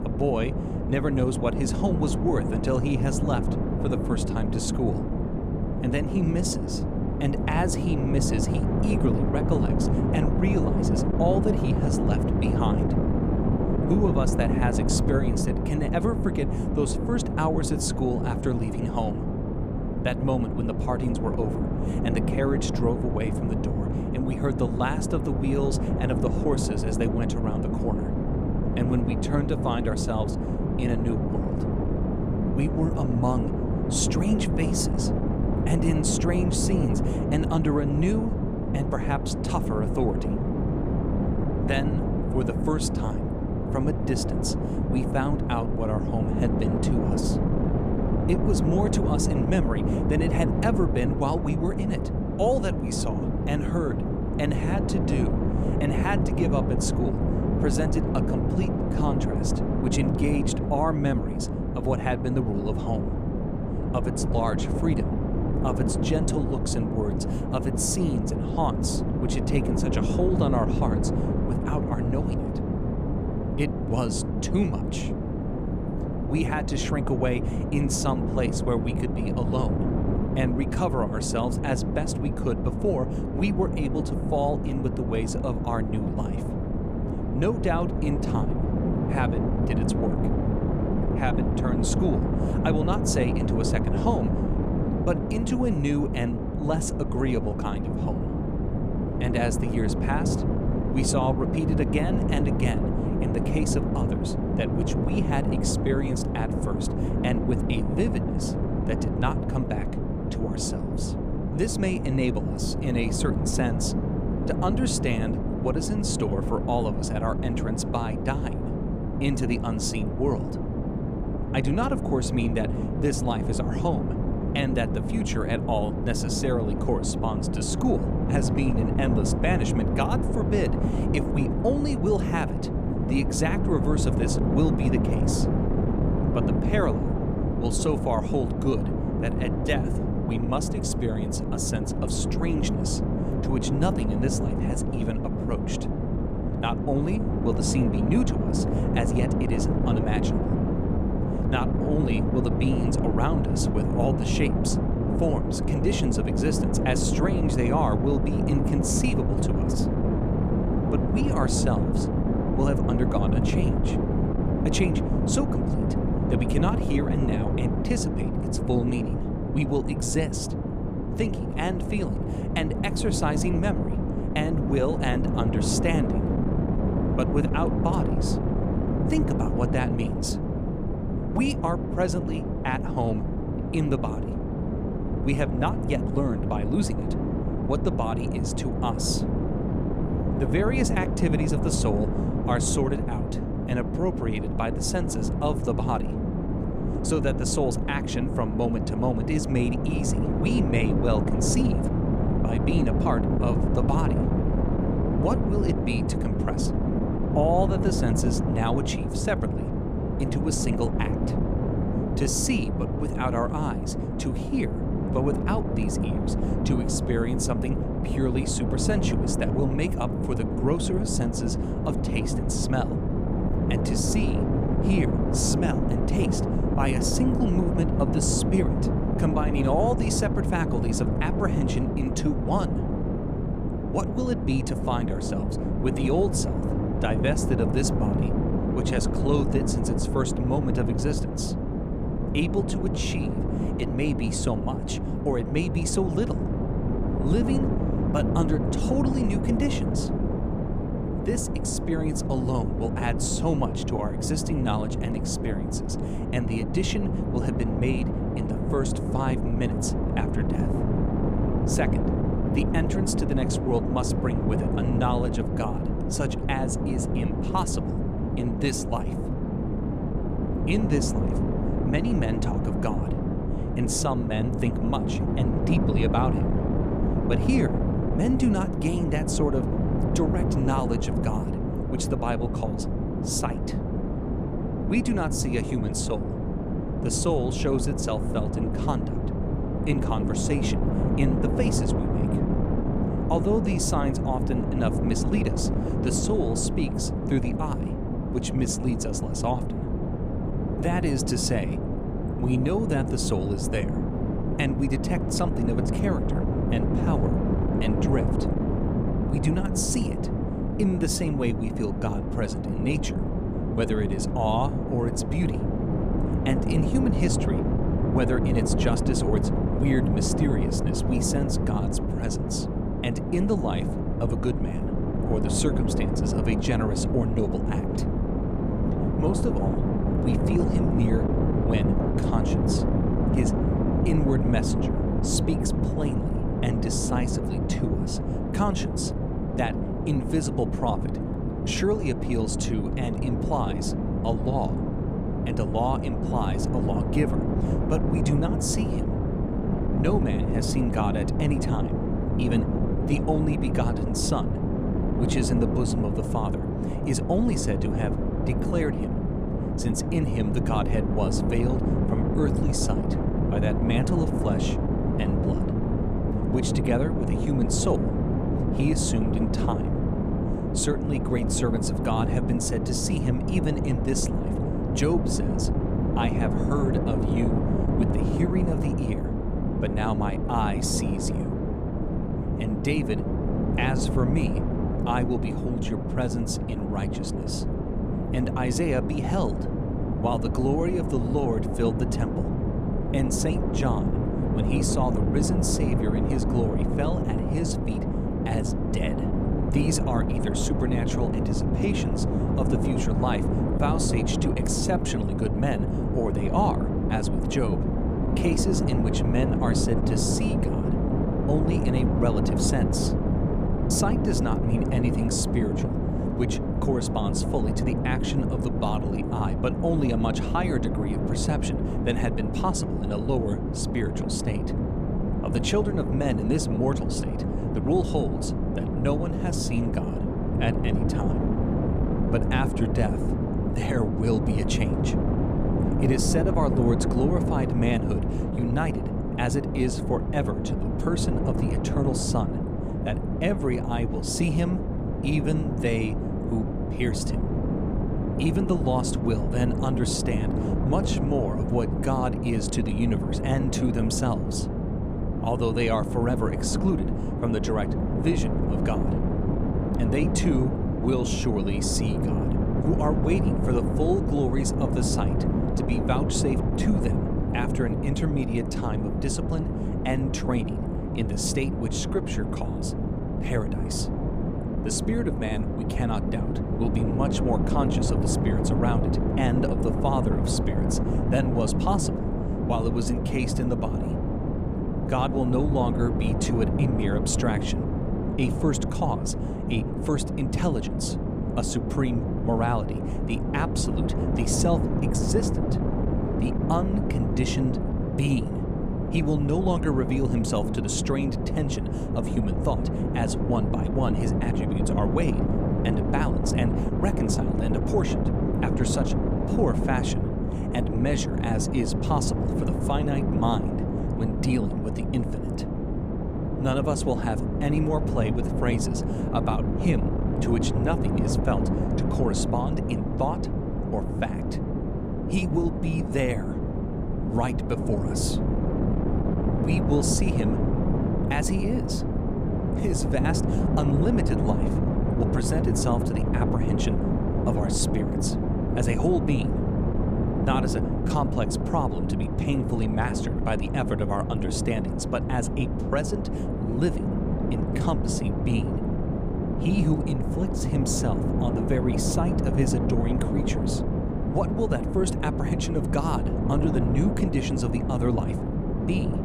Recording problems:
wind noise on the microphone; heavy; 2 dB below the speech

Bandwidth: 15 kHz